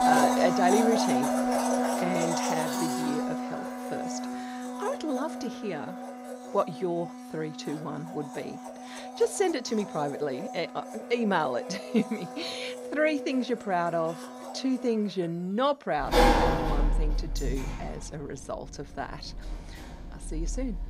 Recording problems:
household noises; very loud; throughout; as loud as the speech

